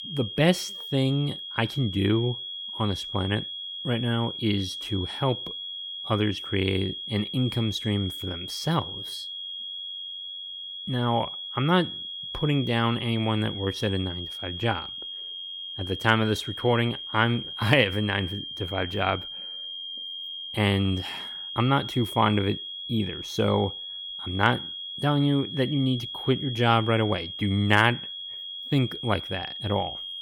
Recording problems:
high-pitched whine; loud; throughout; 3.5 kHz, 7 dB below the speech

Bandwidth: 17 kHz